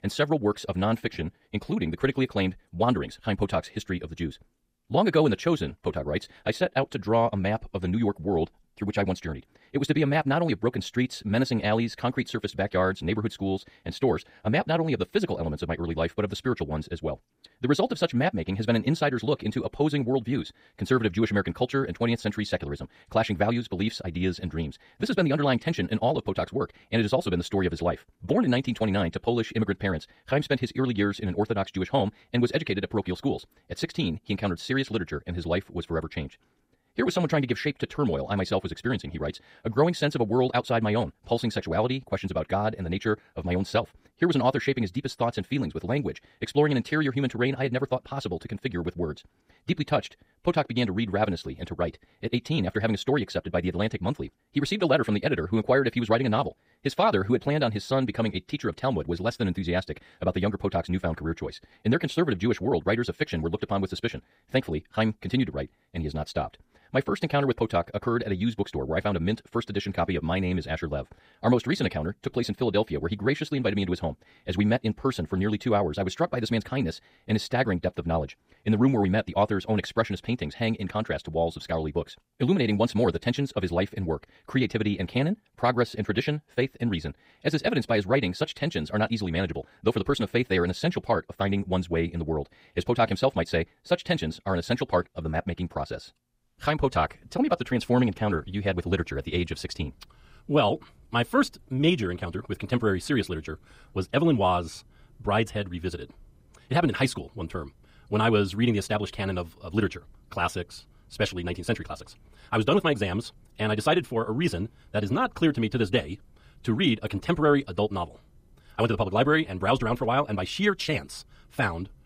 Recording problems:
wrong speed, natural pitch; too fast; 1.8 times normal speed

